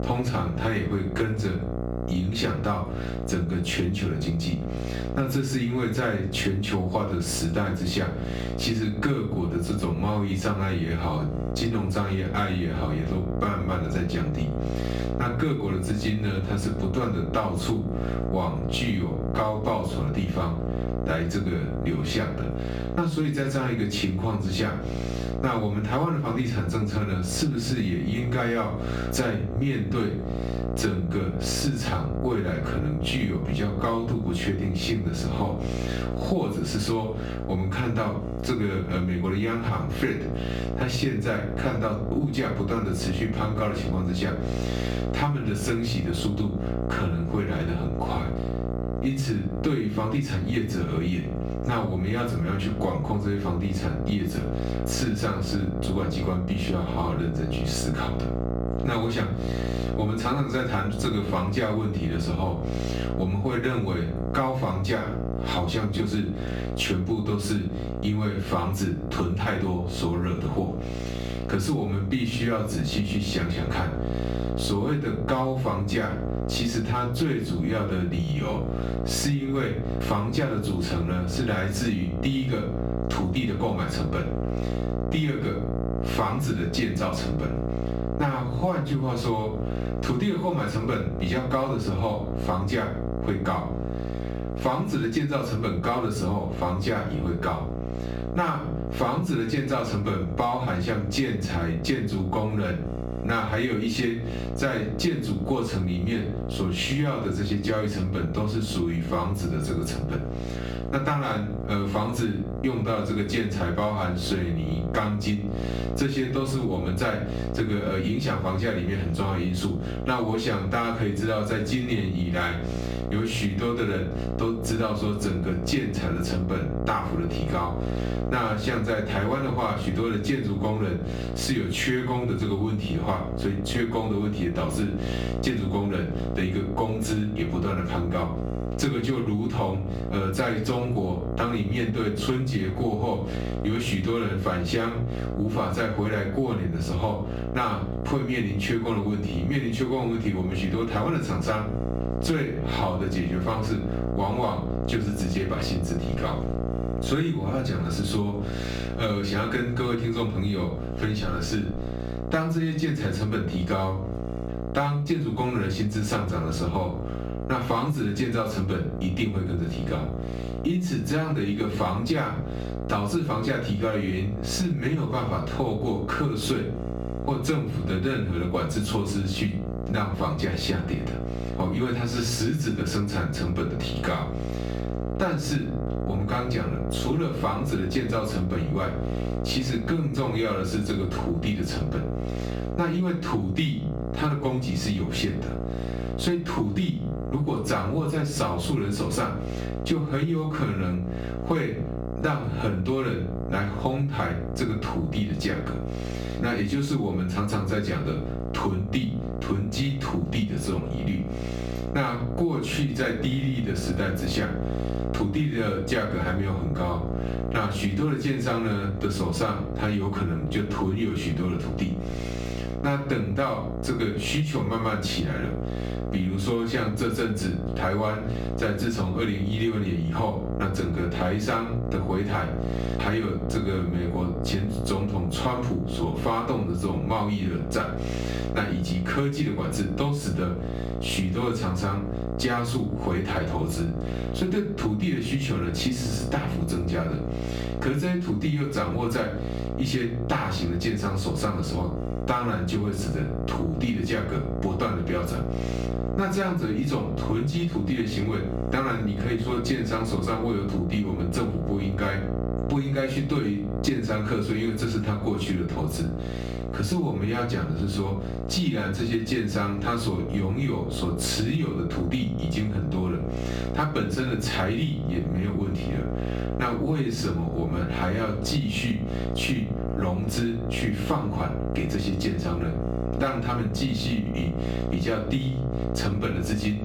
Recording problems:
off-mic speech; far
room echo; slight; dies away in 0.3 s
squashed, flat; somewhat
electrical hum; loud; throughout; 60 Hz, 8 dB below the speech

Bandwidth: 18.5 kHz